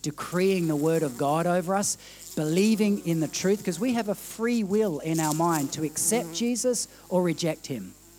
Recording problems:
electrical hum; noticeable; throughout; 50 Hz, 15 dB below the speech

